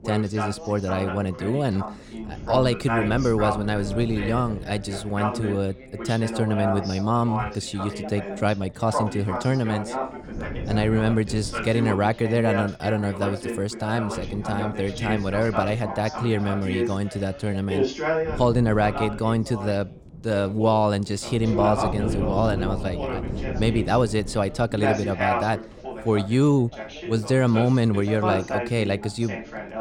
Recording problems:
background chatter; loud; throughout; 2 voices, 7 dB below the speech
wind noise on the microphone; occasional gusts; 15 dB below the speech

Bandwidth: 17 kHz